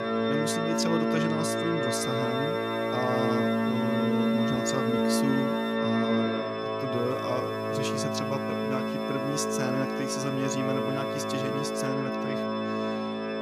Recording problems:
background music; very loud; throughout; 5 dB above the speech
hiss; faint; from 2 to 6 s and from 7 to 12 s; 25 dB below the speech

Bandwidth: 14.5 kHz